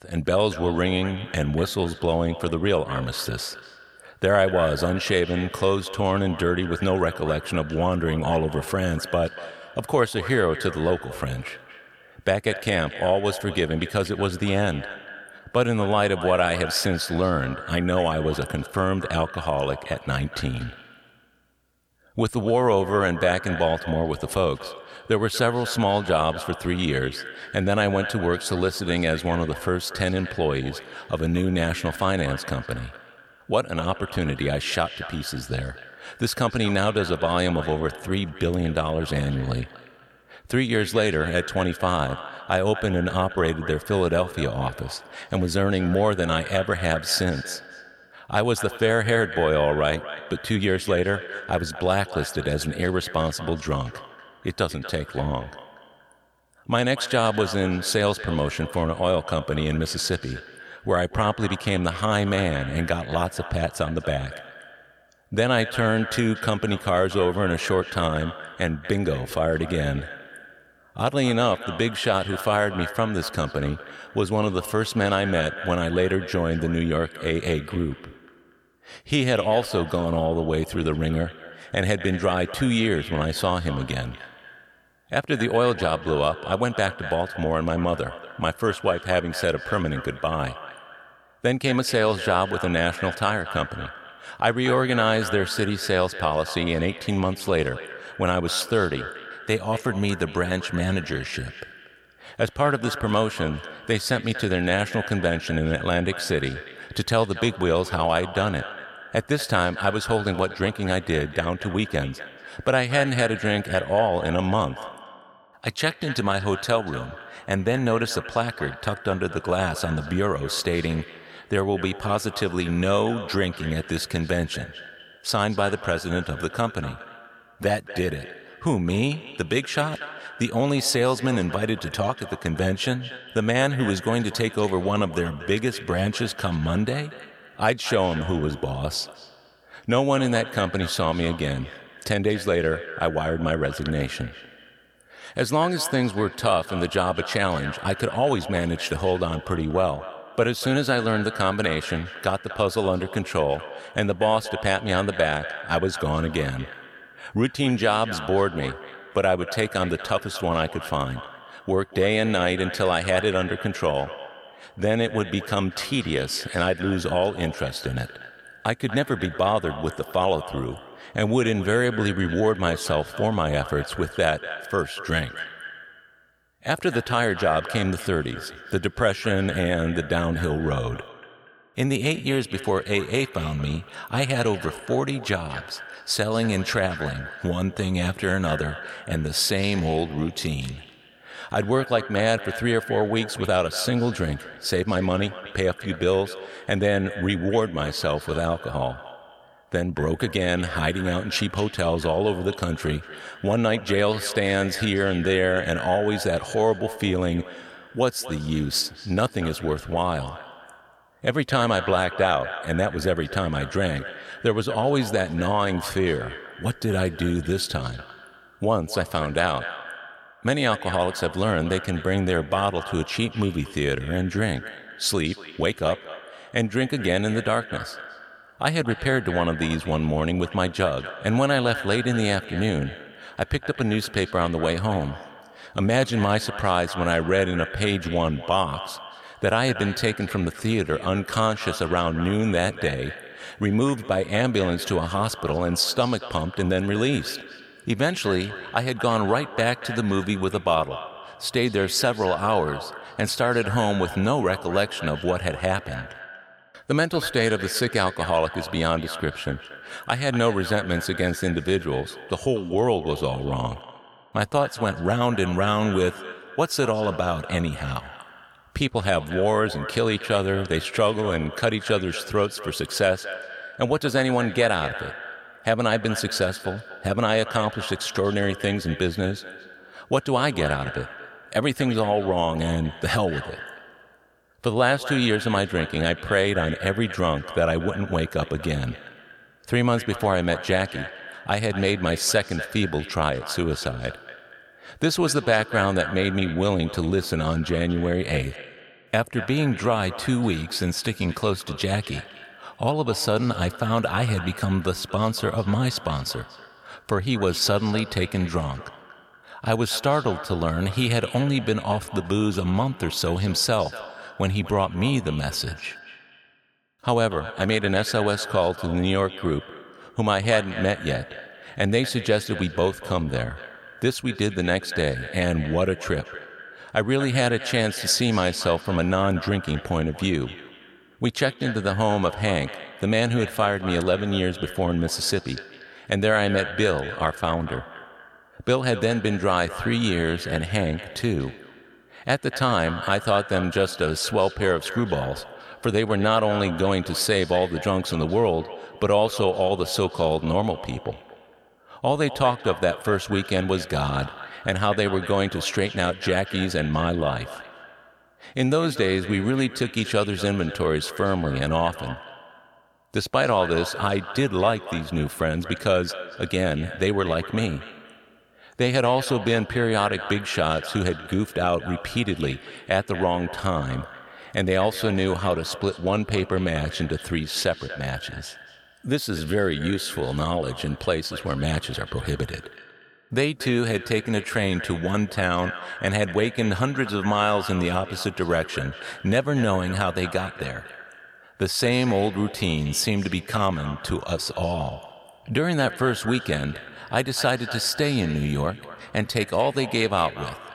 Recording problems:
echo of what is said; noticeable; throughout; 240 ms later, 15 dB below the speech

